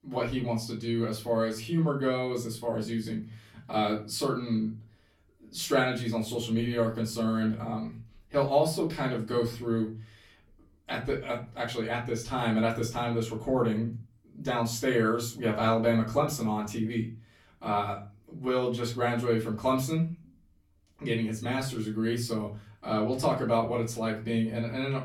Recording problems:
off-mic speech; far
room echo; slight; dies away in 0.3 s

